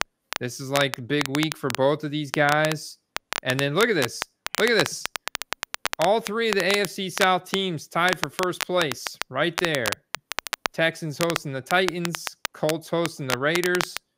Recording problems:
crackle, like an old record; loud; 7 dB below the speech

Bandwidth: 15.5 kHz